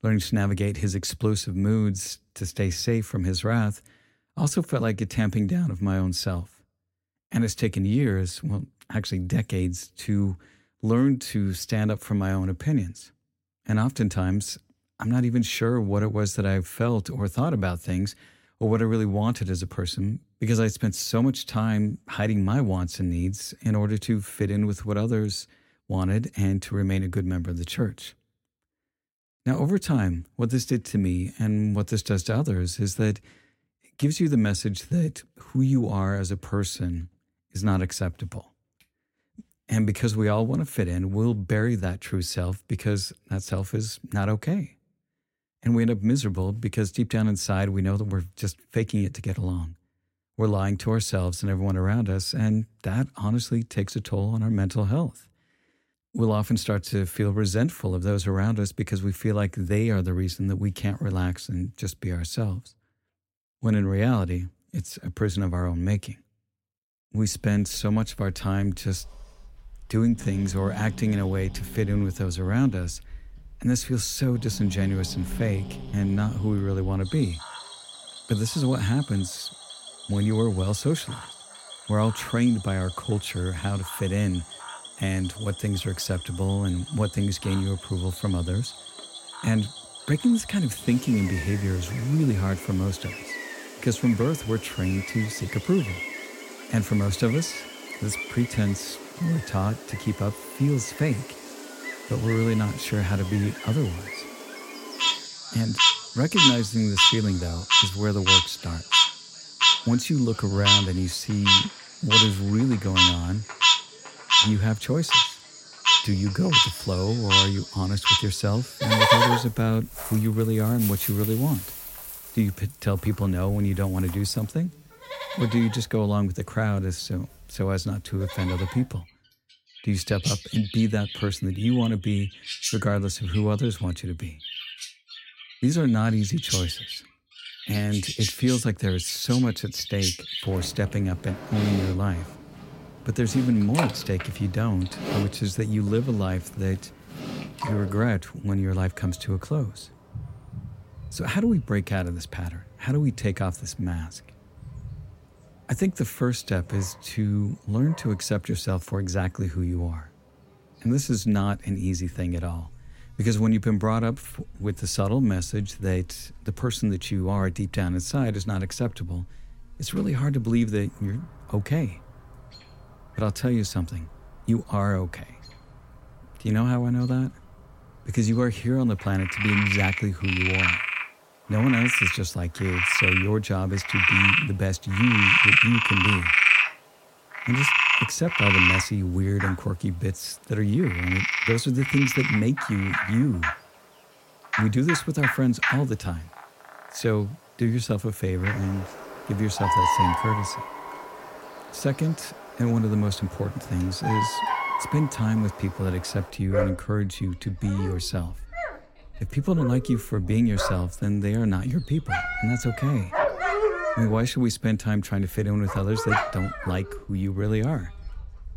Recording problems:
animal sounds; very loud; from 1:07 on; 2 dB above the speech

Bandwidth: 16.5 kHz